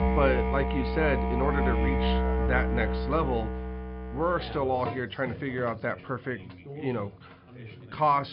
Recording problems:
high frequencies cut off; noticeable; nothing above 5.5 kHz
muffled; very slightly; fading above 4 kHz
background music; very loud; throughout; as loud as the speech
background chatter; noticeable; throughout; 2 voices, 15 dB below the speech
abrupt cut into speech; at the end

